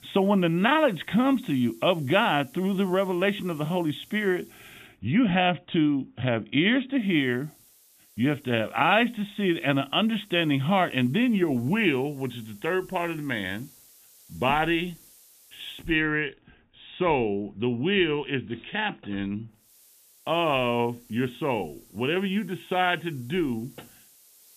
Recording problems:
high frequencies cut off; severe; nothing above 4 kHz
hiss; faint; until 5 s, from 7 to 16 s and from 20 s on; 25 dB below the speech

